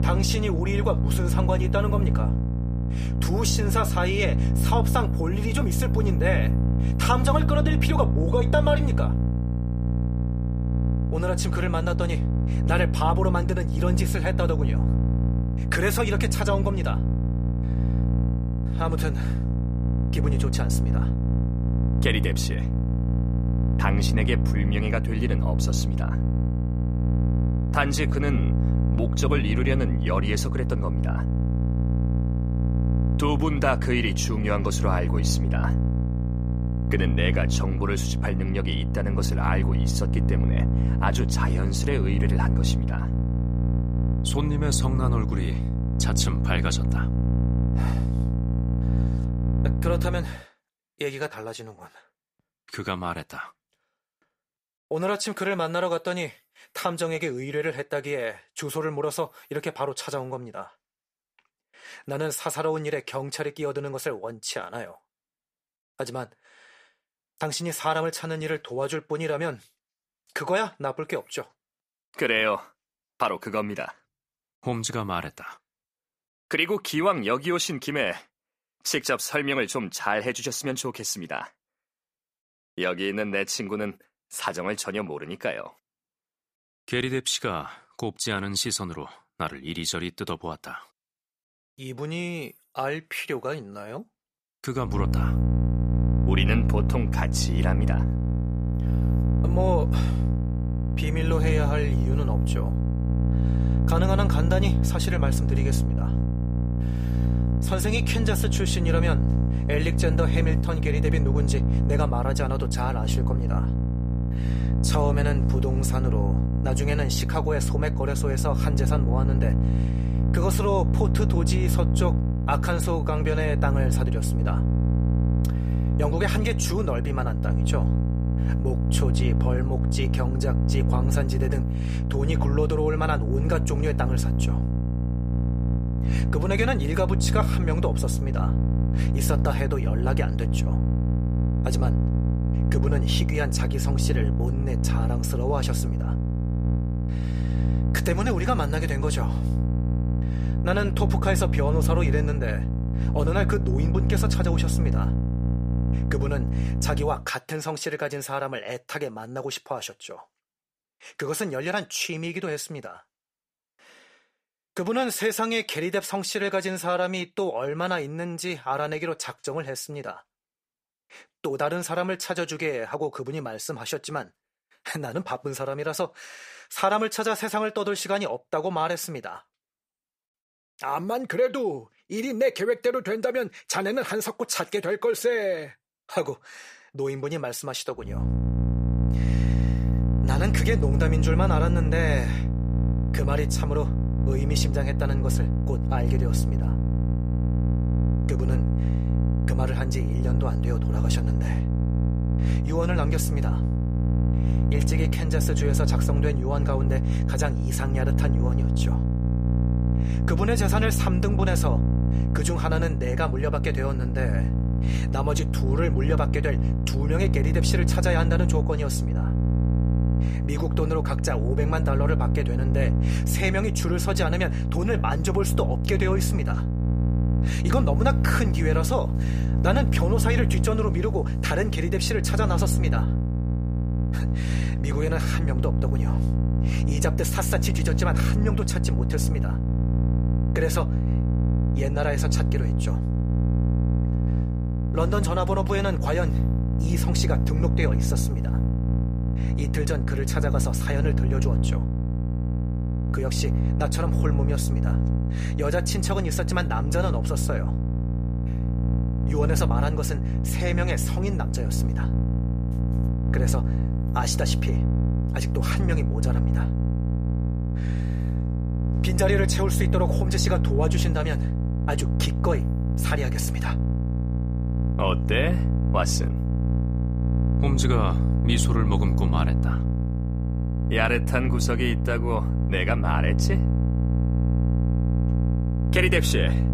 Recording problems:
electrical hum; loud; until 50 s, from 1:35 to 2:37 and from 3:08 on; 60 Hz, 6 dB below the speech

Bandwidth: 15 kHz